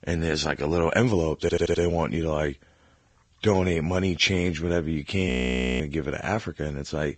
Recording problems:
garbled, watery; badly
high frequencies cut off; noticeable; nothing above 8 kHz
audio stuttering; at 1.5 s
audio freezing; at 5.5 s for 0.5 s

